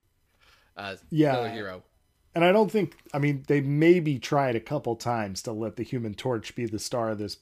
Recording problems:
none

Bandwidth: 15 kHz